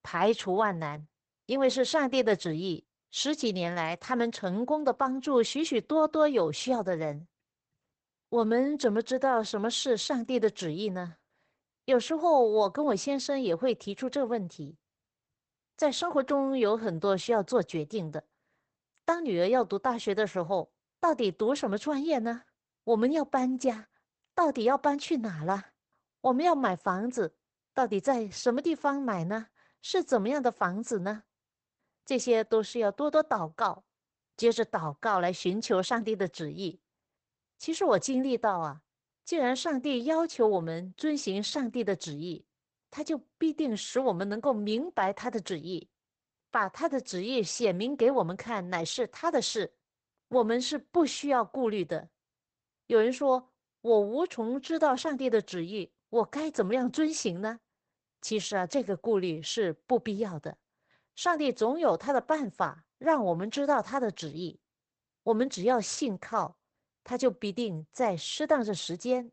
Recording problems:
garbled, watery; badly; nothing above 8 kHz

